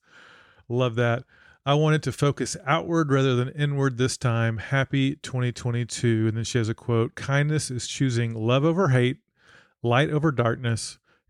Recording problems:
none

